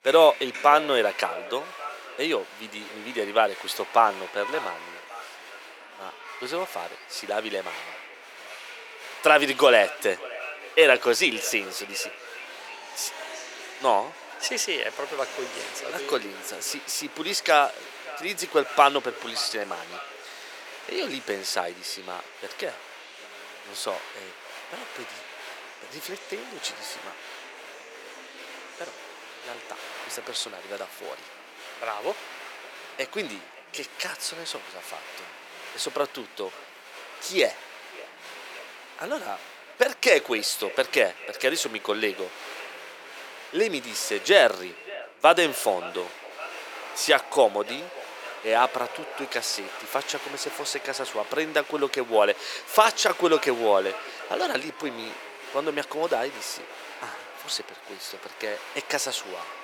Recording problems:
thin; very; fading below 450 Hz
echo of what is said; faint; throughout; 570 ms later, 20 dB below the speech
crowd noise; noticeable; throughout; 15 dB below the speech

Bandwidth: 17 kHz